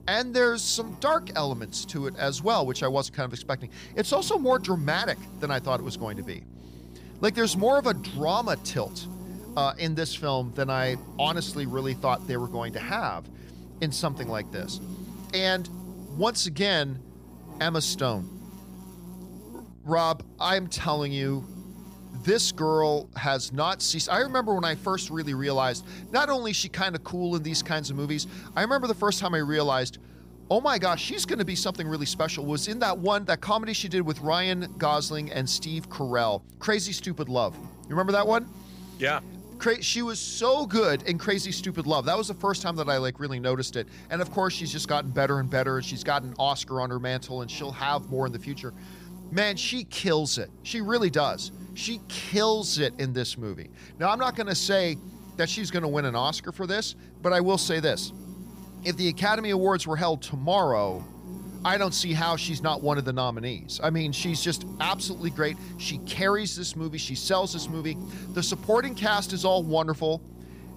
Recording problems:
electrical hum; faint; throughout; 60 Hz, 20 dB below the speech

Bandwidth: 15 kHz